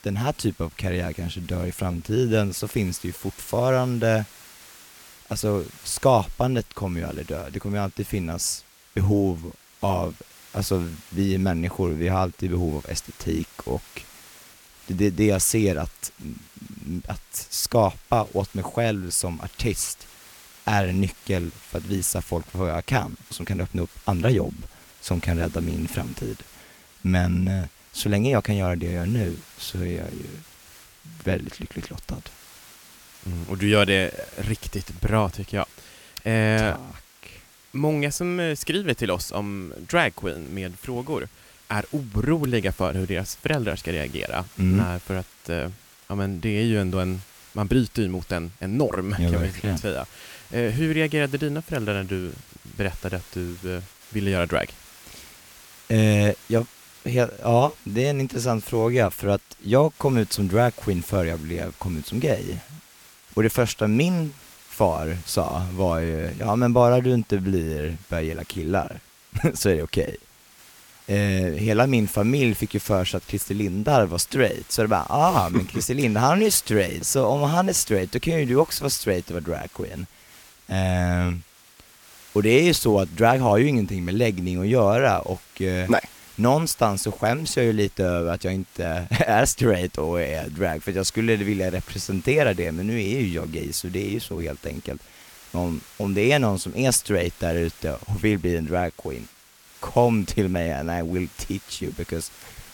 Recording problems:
hiss; faint; throughout; 25 dB below the speech

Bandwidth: 17.5 kHz